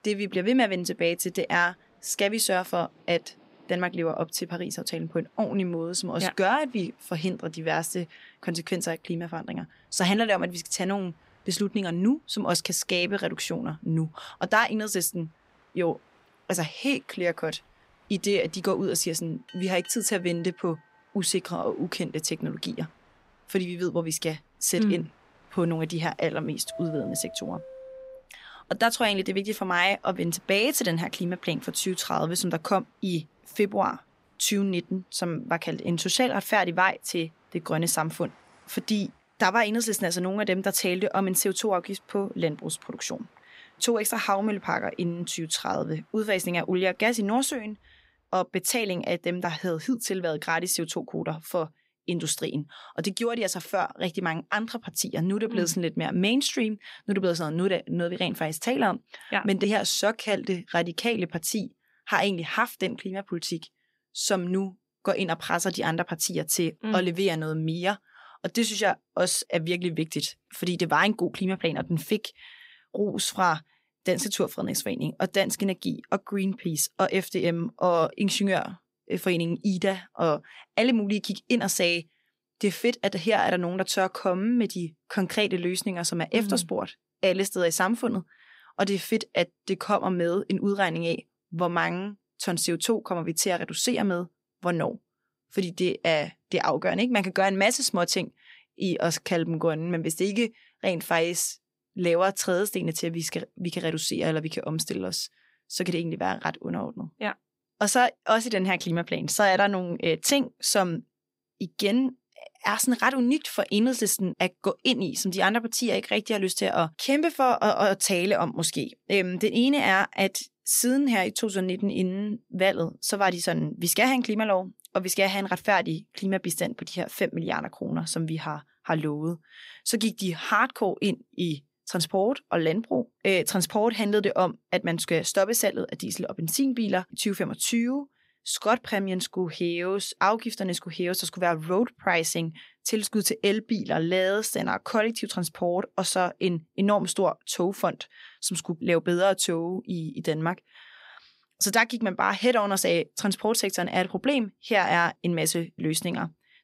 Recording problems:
train or aircraft noise; faint; until 48 s; 25 dB below the speech

